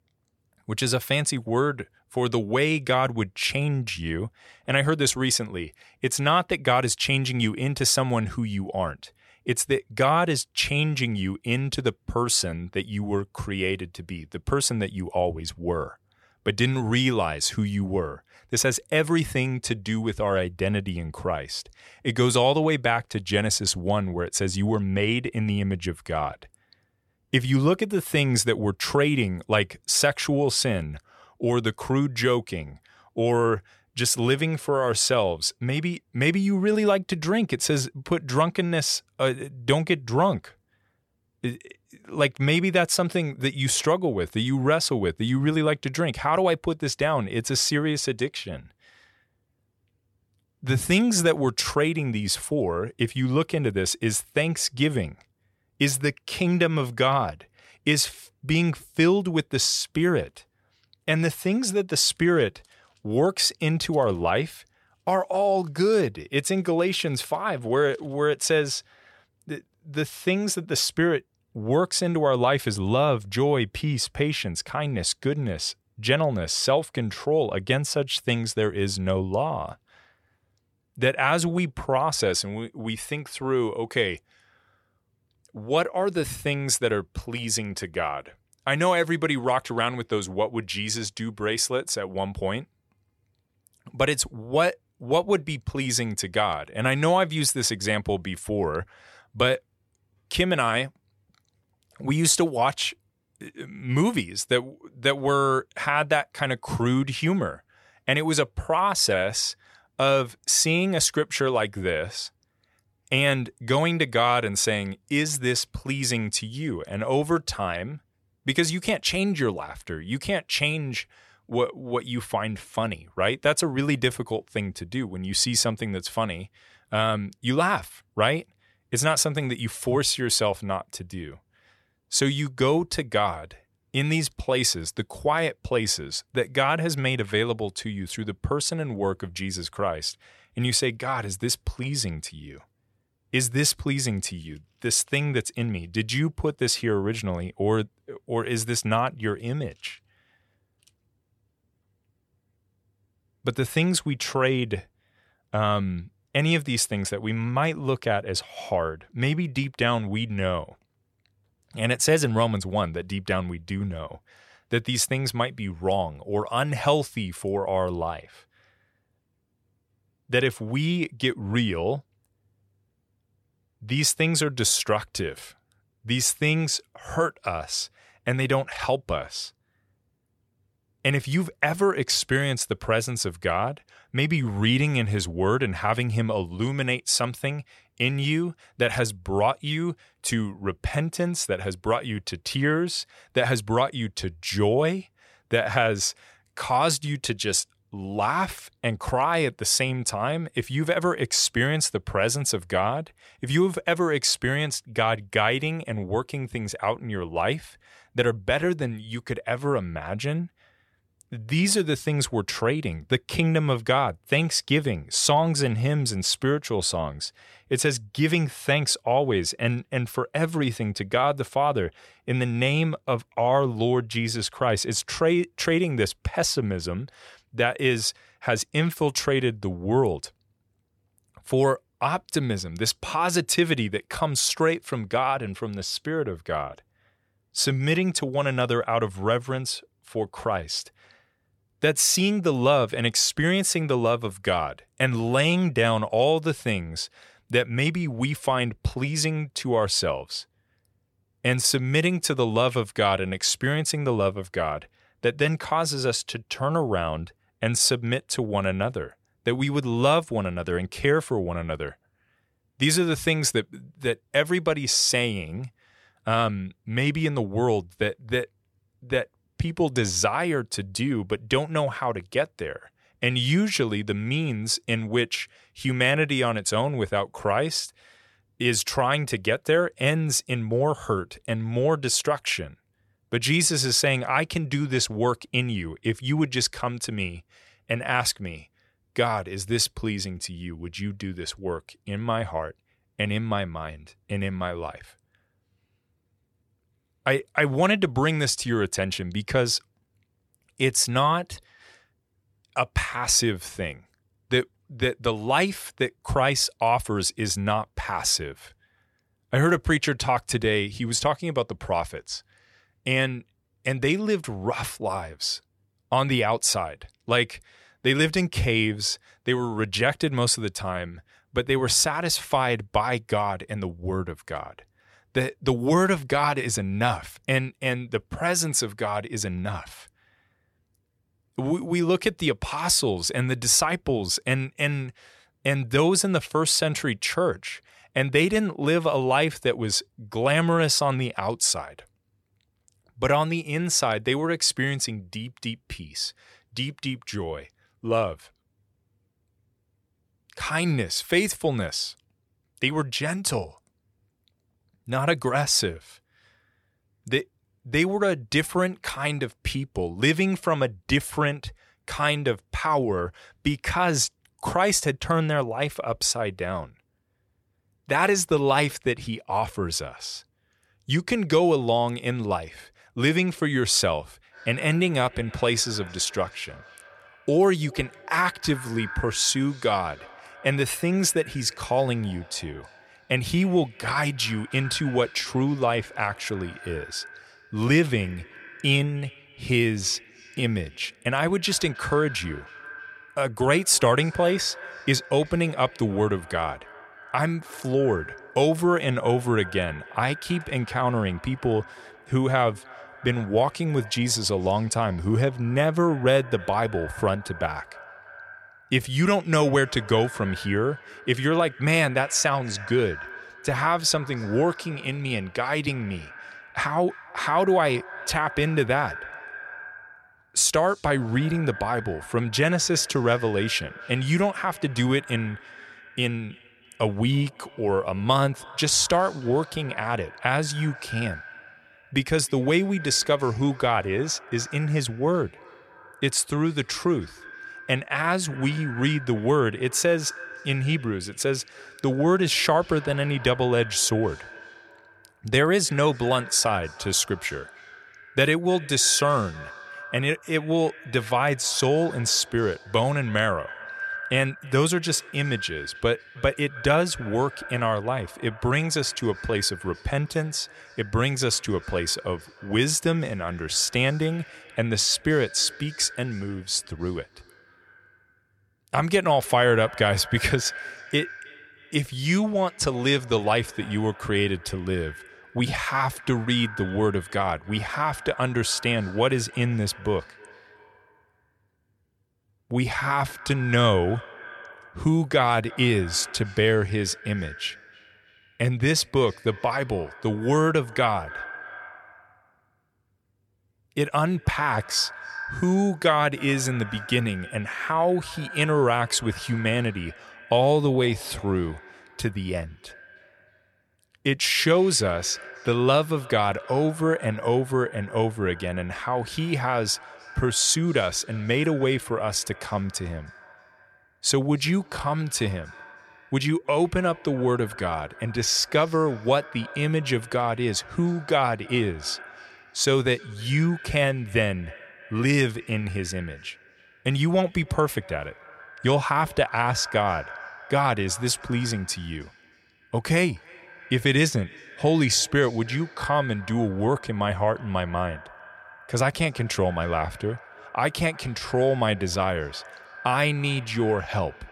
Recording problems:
echo of what is said; noticeable; from 6:14 on; 310 ms later, 15 dB below the speech

